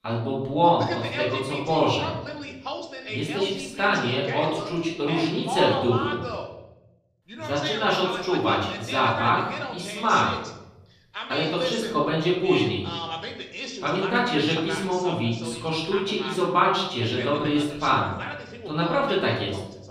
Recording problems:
off-mic speech; far
room echo; noticeable; dies away in 0.9 s
voice in the background; loud; throughout; 9 dB below the speech

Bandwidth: 14.5 kHz